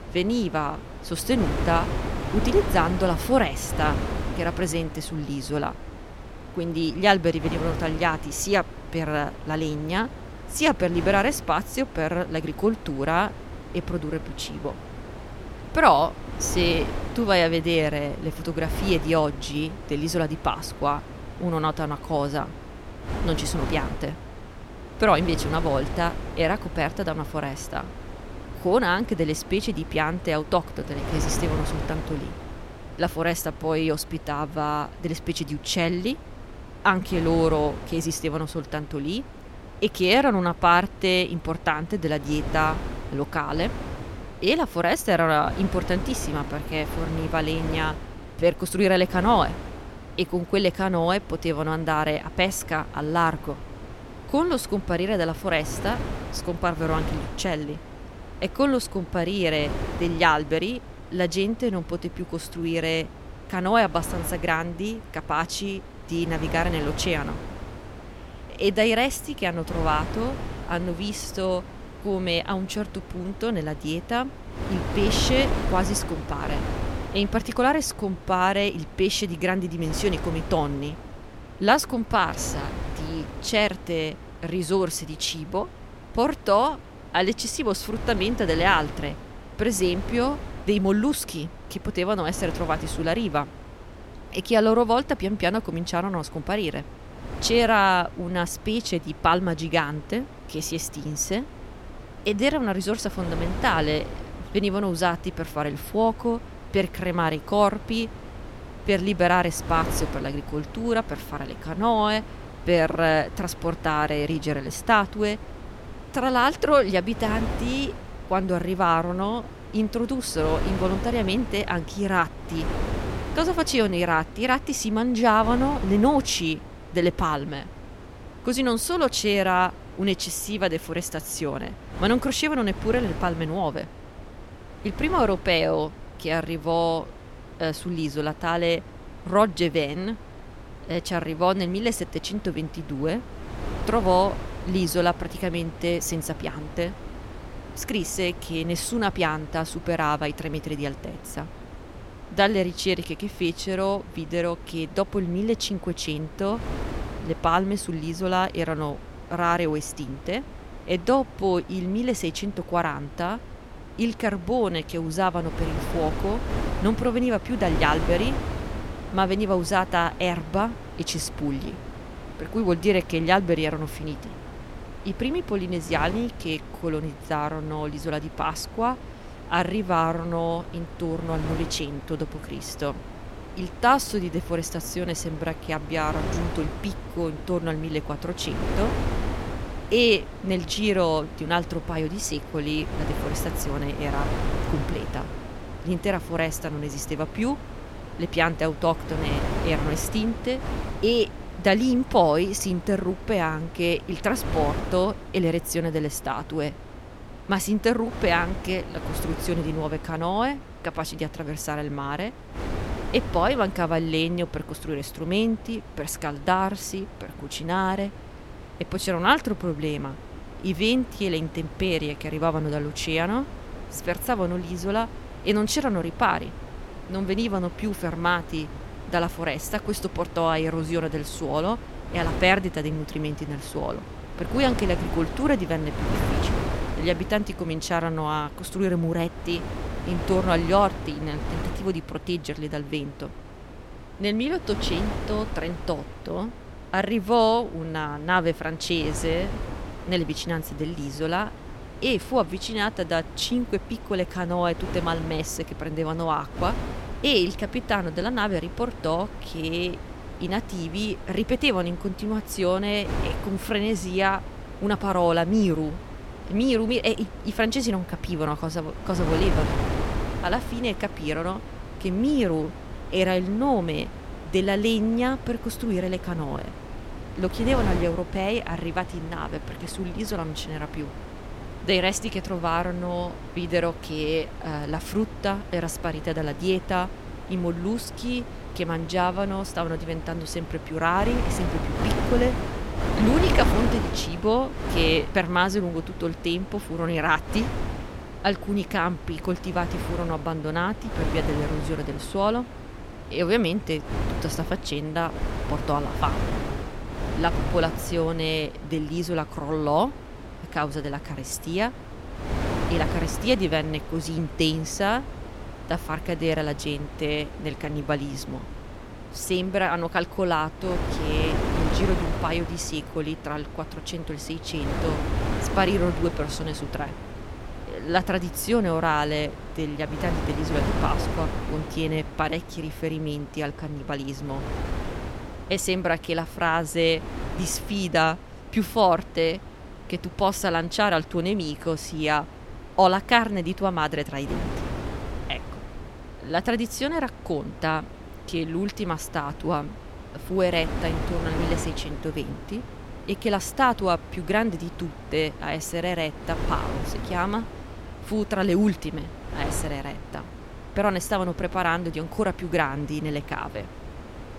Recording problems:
wind noise on the microphone; occasional gusts; 15 dB below the speech

